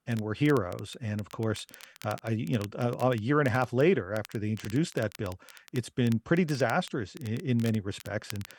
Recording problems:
crackle, like an old record; faint; 20 dB below the speech

